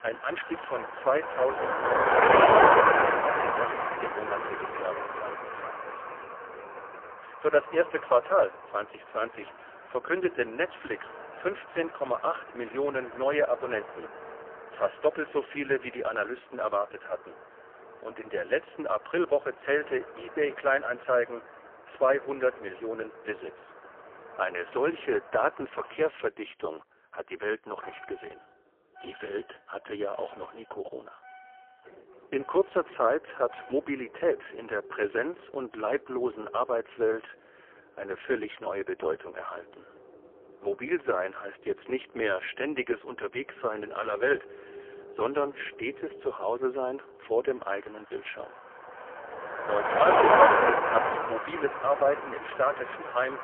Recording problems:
phone-call audio; poor line; nothing above 3 kHz
traffic noise; very loud; throughout; 5 dB above the speech

